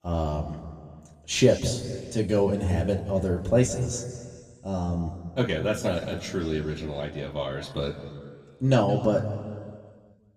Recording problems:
room echo; slight; dies away in 1.8 s
off-mic speech; somewhat distant

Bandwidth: 15 kHz